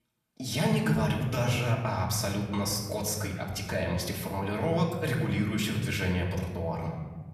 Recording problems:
off-mic speech; far
room echo; slight; dies away in 1.4 s

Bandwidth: 14.5 kHz